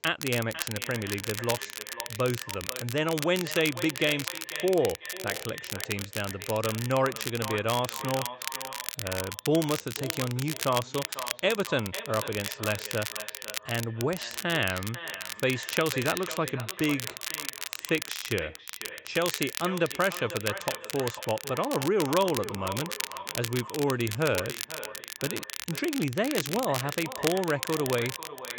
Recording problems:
echo of what is said; noticeable; throughout; 500 ms later, 10 dB below the speech
high frequencies cut off; noticeable; nothing above 8 kHz
crackle, like an old record; loud; 6 dB below the speech

